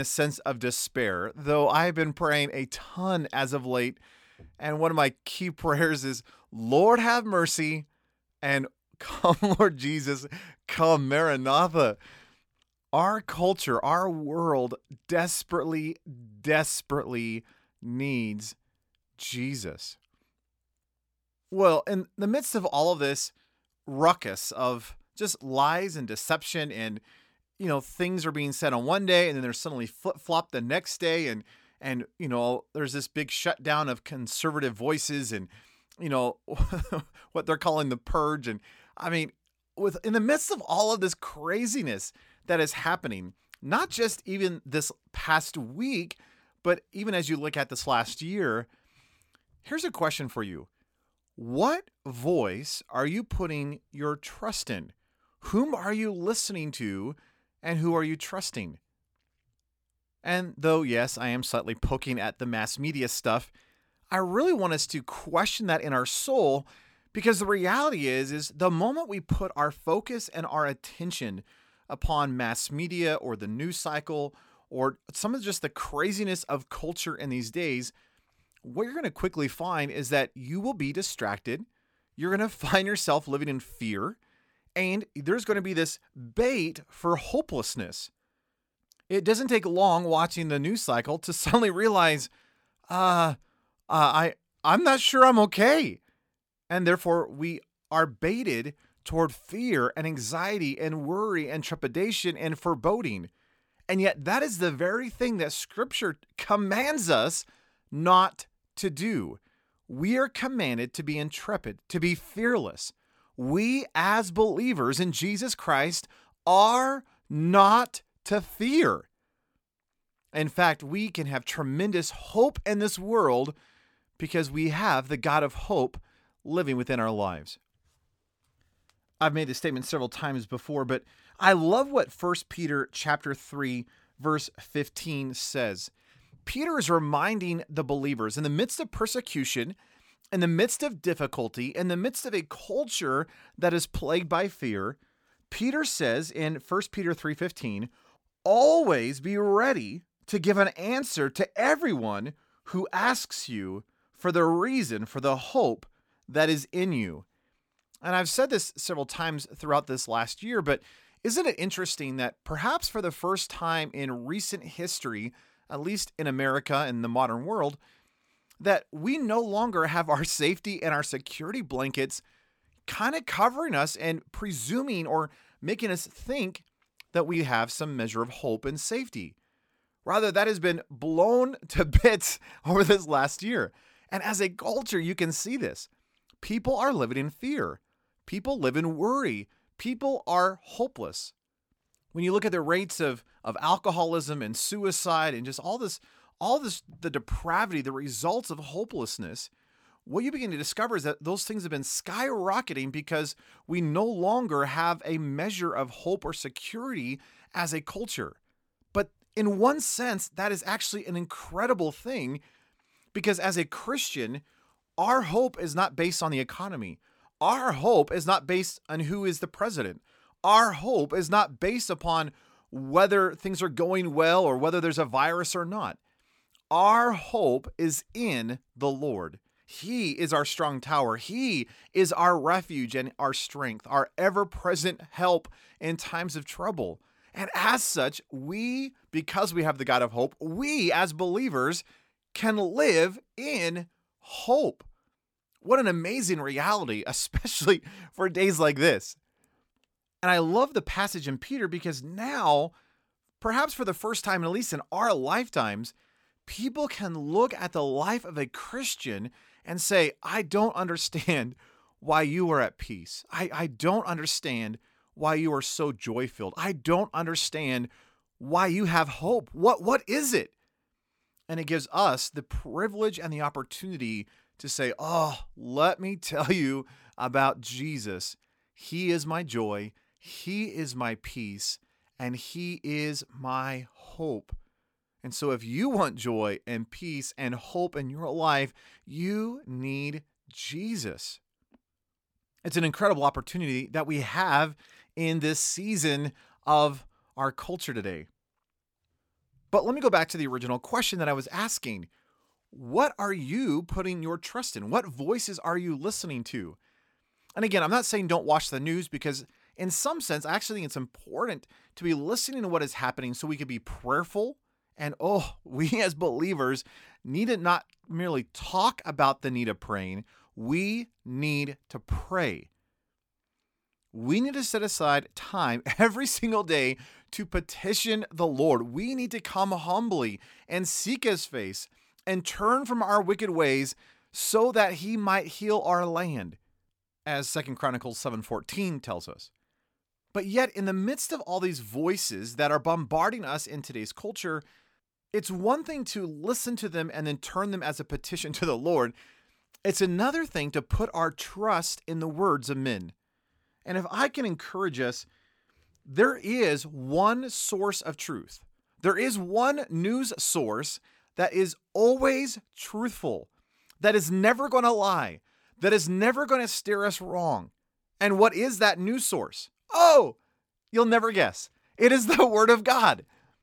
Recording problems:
abrupt cut into speech; at the start

